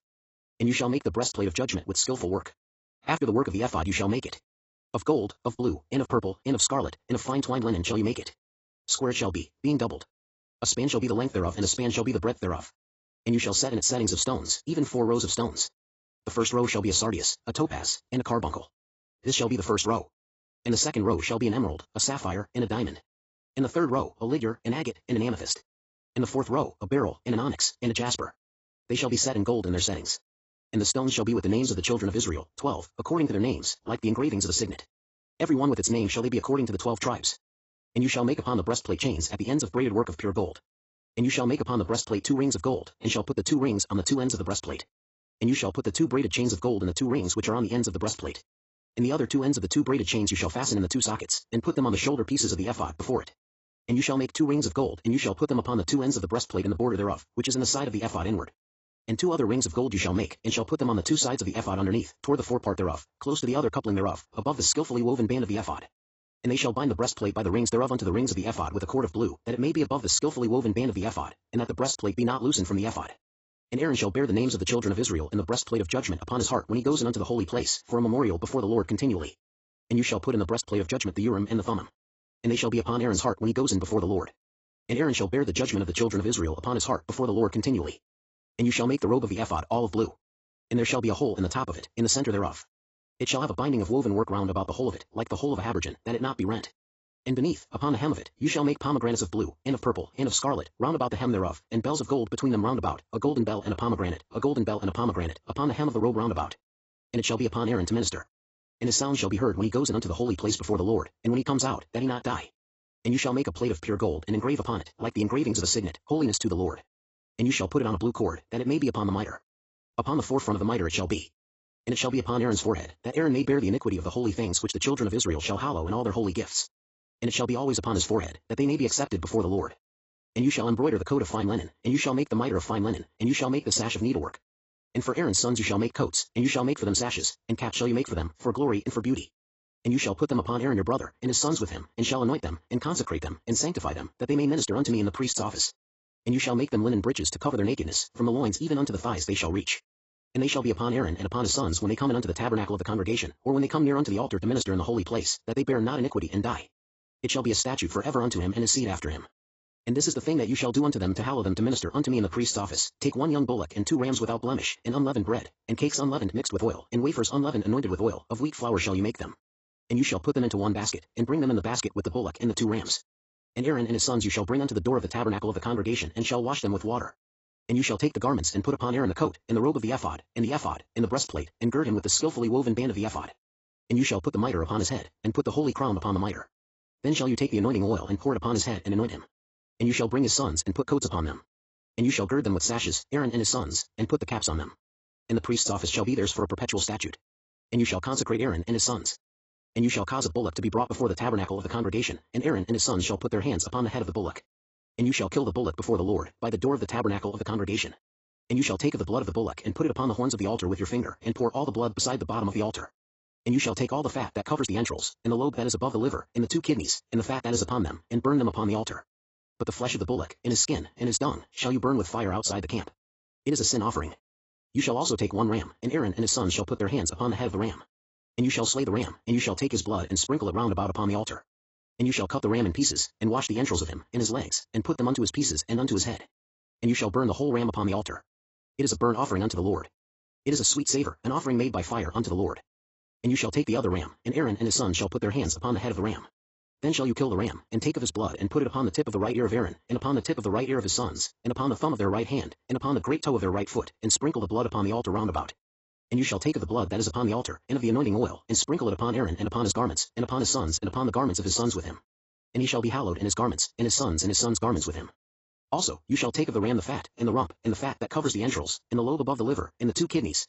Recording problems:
garbled, watery; badly; nothing above 8 kHz
wrong speed, natural pitch; too fast; 1.6 times normal speed

